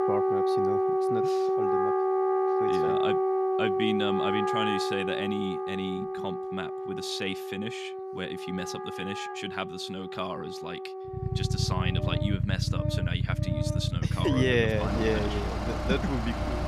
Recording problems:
background music; very loud; throughout; 3 dB above the speech
traffic noise; very loud; from 11 s on; 3 dB above the speech

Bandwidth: 14.5 kHz